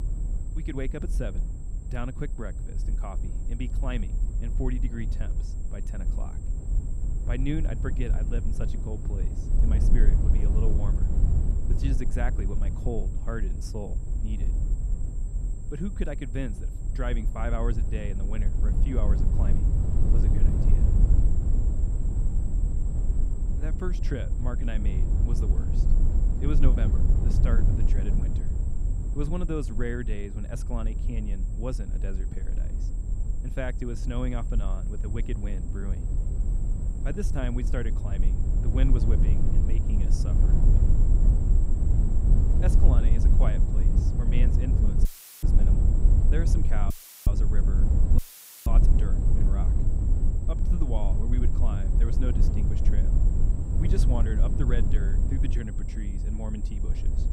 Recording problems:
low rumble; loud; throughout; 3 dB below the speech
high-pitched whine; noticeable; throughout; 7.5 kHz, 20 dB below the speech
audio cutting out; filled with static; at 45 s, at 47 s and at 48 s

